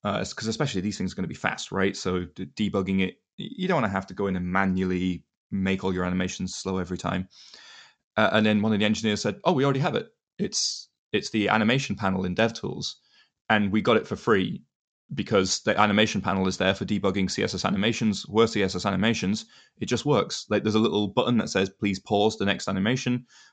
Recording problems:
high frequencies cut off; noticeable; nothing above 8 kHz

